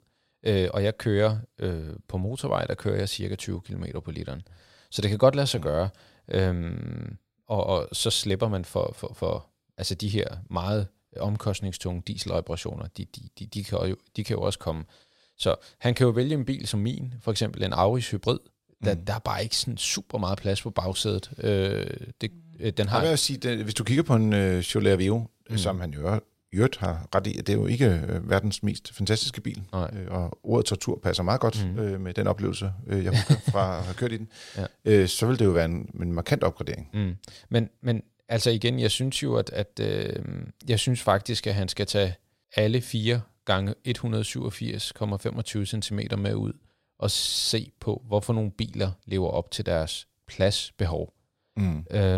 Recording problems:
abrupt cut into speech; at the end

